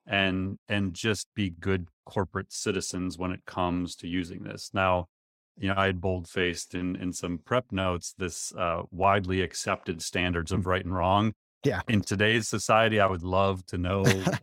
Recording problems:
none

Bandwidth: 16.5 kHz